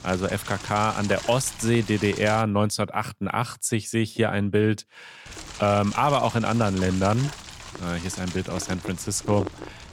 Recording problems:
wind noise on the microphone; occasional gusts; until 2.5 s and from 5.5 s on; 10 dB below the speech

